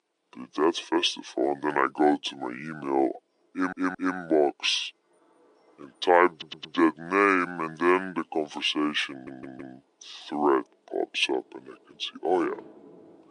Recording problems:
wrong speed and pitch; too slow and too low; 0.6 times normal speed
thin; somewhat; fading below 300 Hz
rain or running water; faint; throughout; 25 dB below the speech
audio stuttering; at 3.5 s, at 6.5 s and at 9 s

